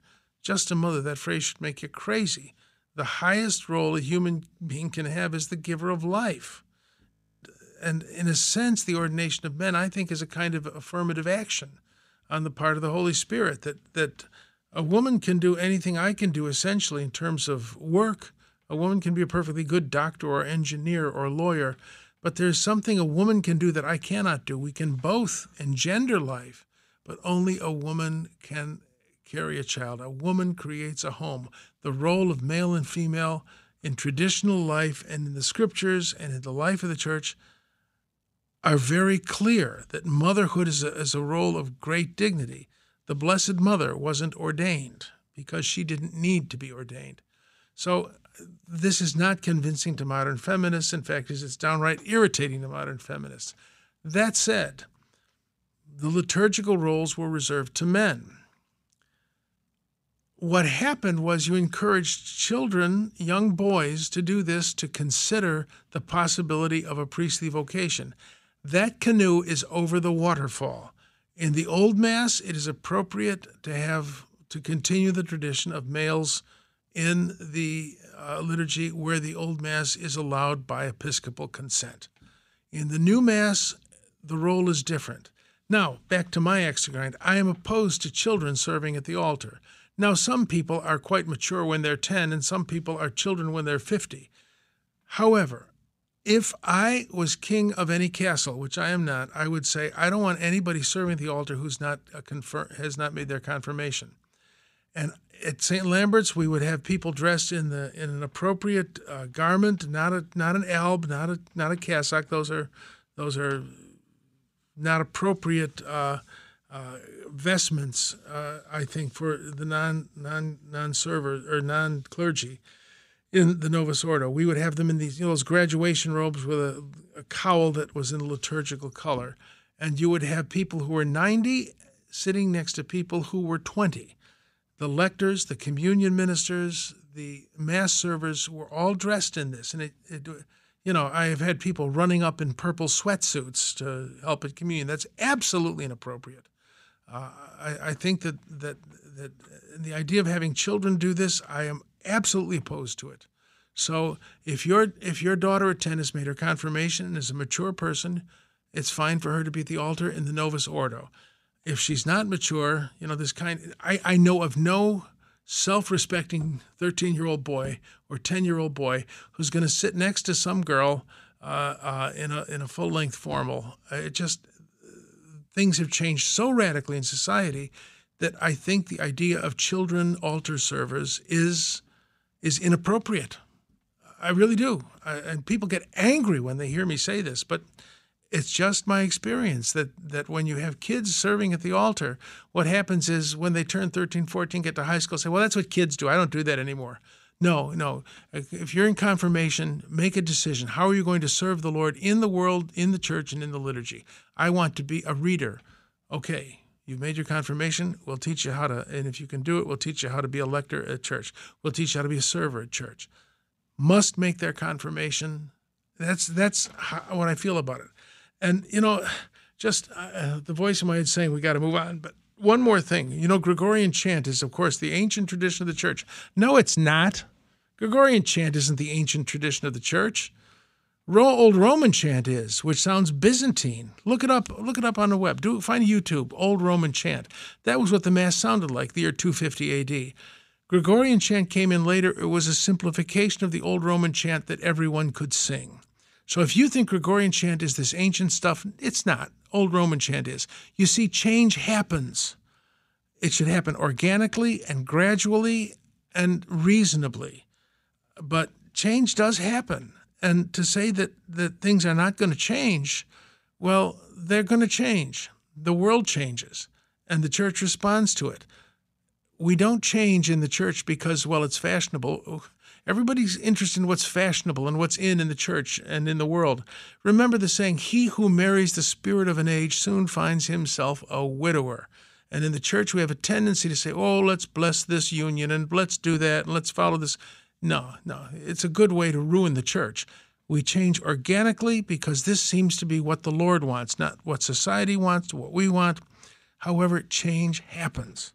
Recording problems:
audio freezing; at 7 s

